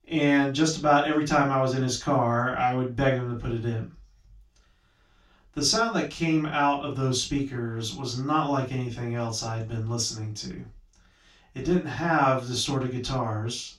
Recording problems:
off-mic speech; far
room echo; slight; dies away in 0.2 s

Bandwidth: 16 kHz